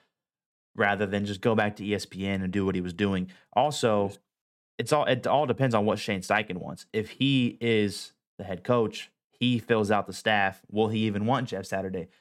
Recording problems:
none

